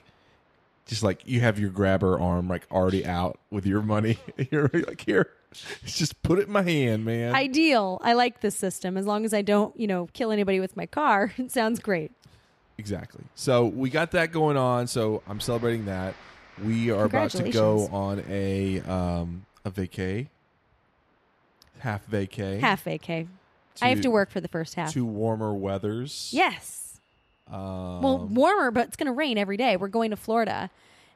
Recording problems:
train or aircraft noise; faint; throughout; 30 dB below the speech

